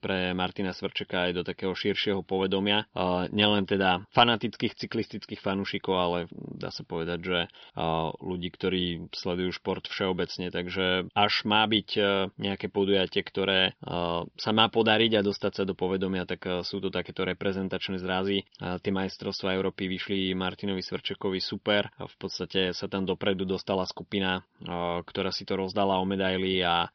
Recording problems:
high frequencies cut off; noticeable; nothing above 5.5 kHz

